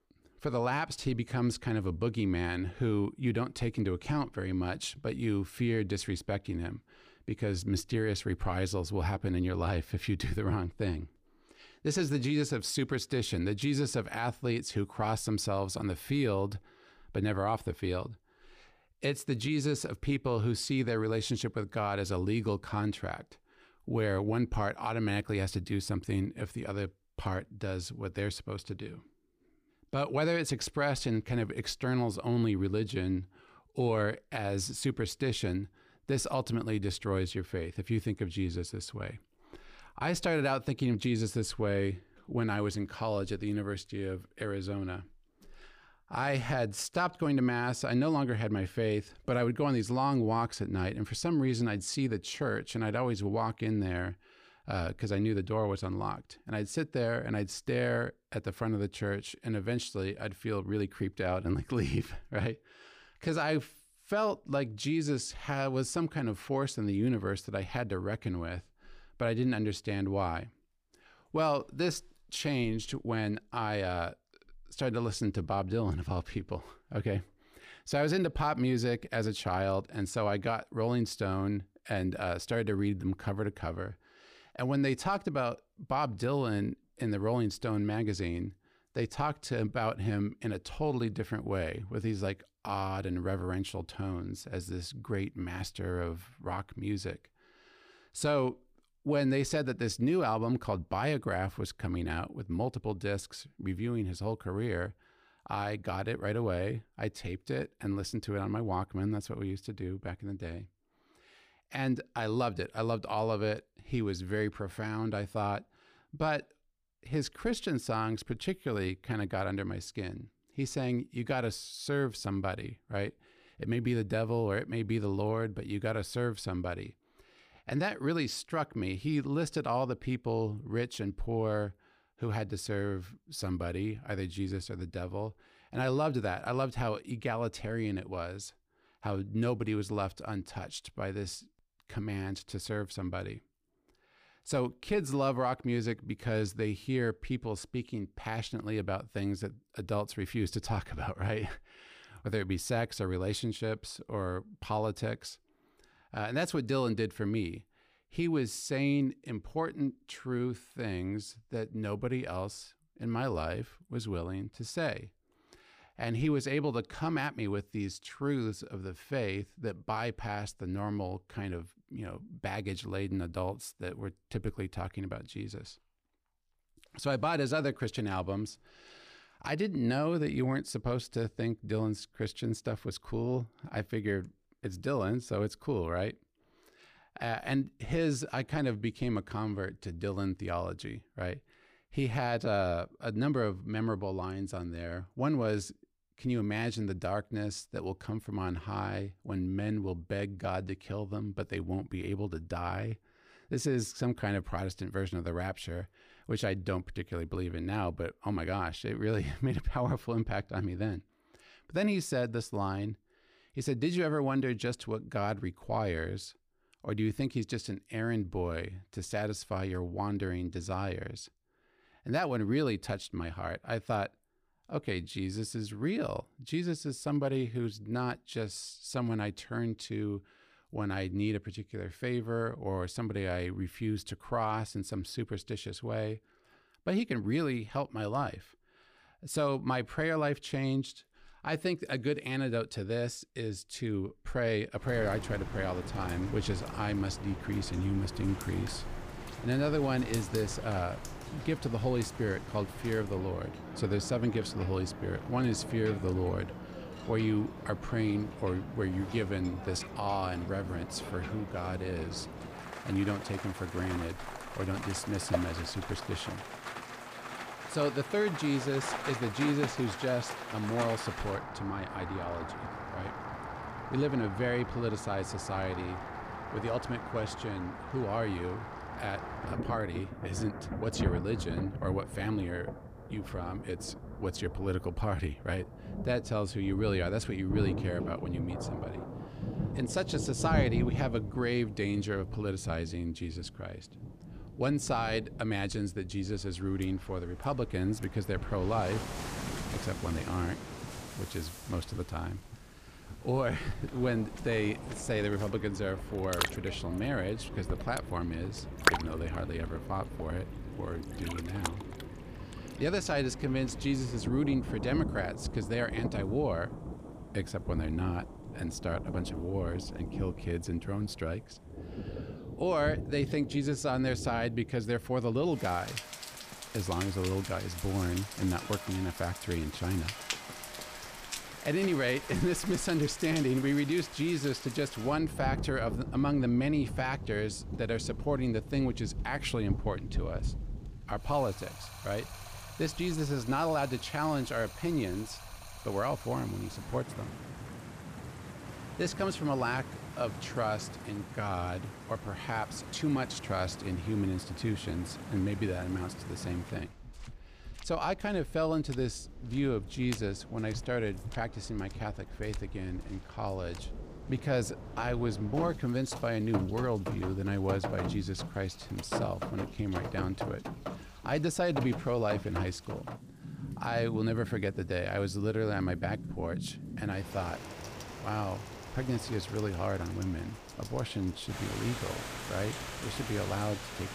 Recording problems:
rain or running water; loud; from 4:05 on; 7 dB below the speech

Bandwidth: 15 kHz